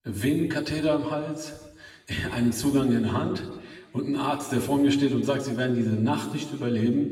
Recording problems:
off-mic speech; far
room echo; noticeable; dies away in 1.1 s

